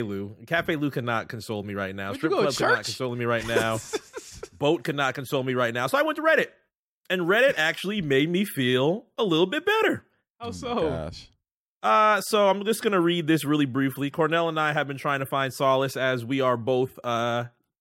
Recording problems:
abrupt cut into speech; at the start

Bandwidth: 16 kHz